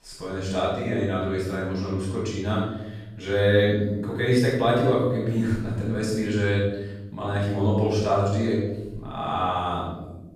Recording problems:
room echo; strong; dies away in 1.1 s
off-mic speech; far

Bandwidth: 14.5 kHz